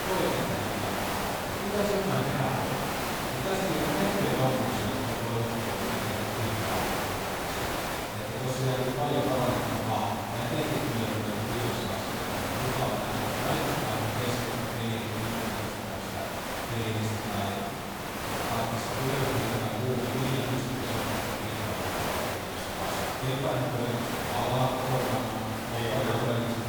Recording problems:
room echo; strong; dies away in 1.9 s
off-mic speech; far
hiss; loud; throughout; 1 dB below the speech

